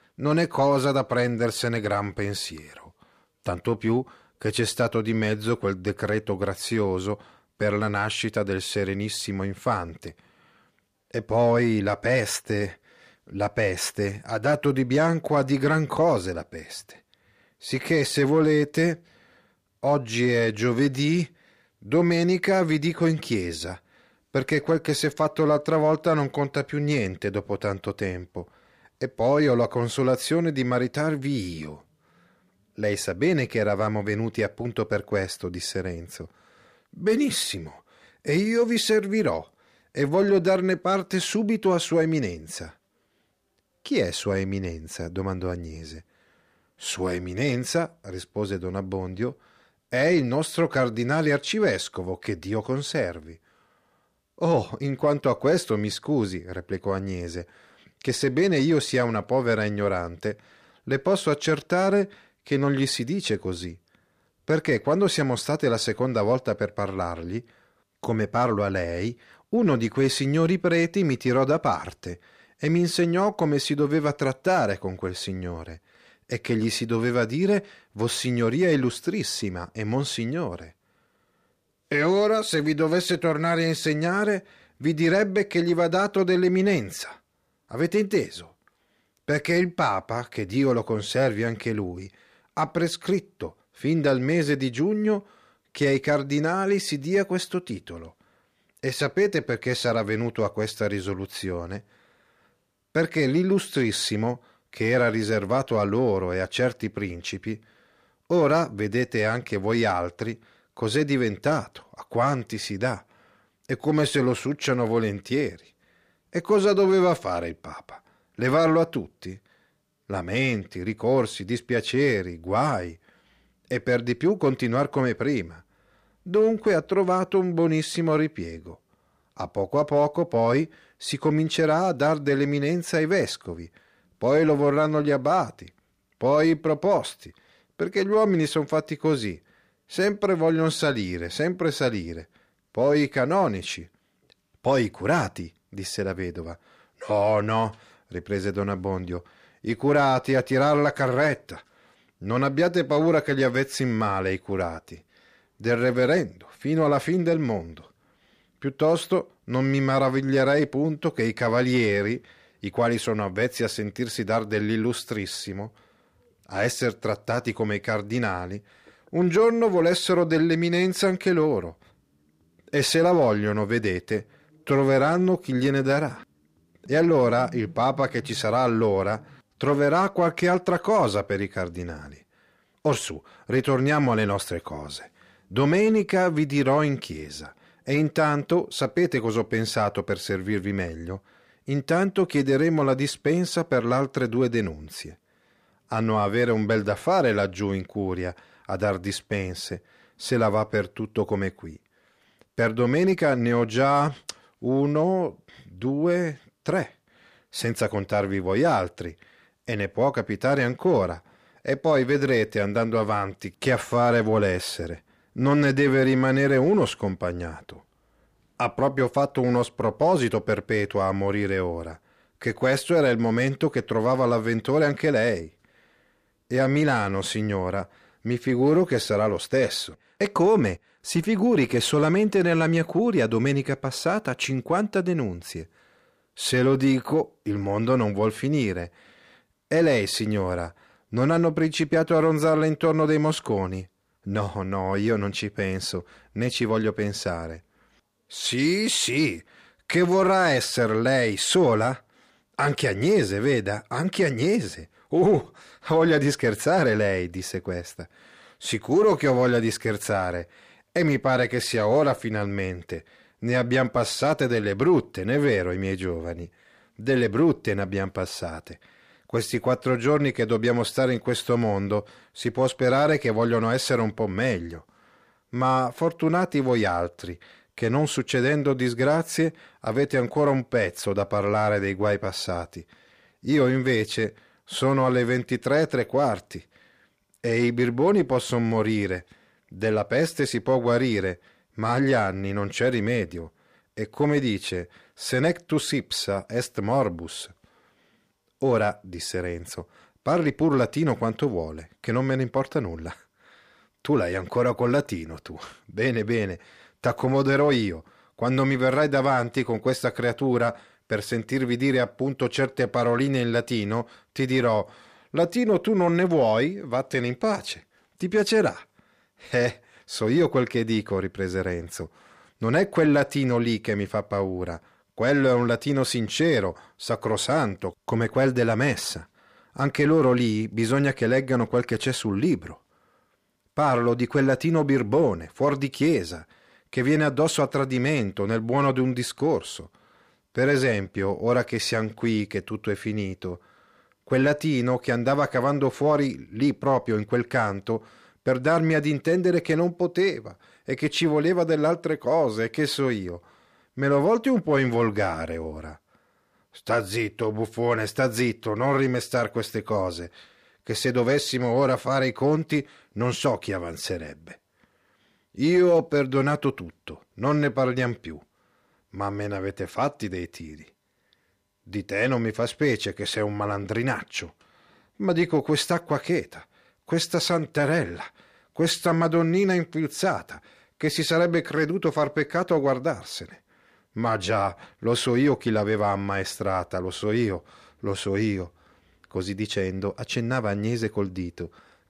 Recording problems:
none

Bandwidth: 15 kHz